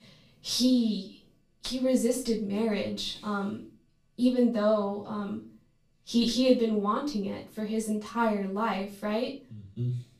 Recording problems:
off-mic speech; far
room echo; slight; dies away in 0.3 s

